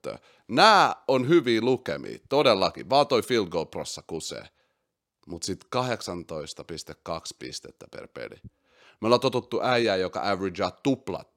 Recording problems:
none

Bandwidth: 16.5 kHz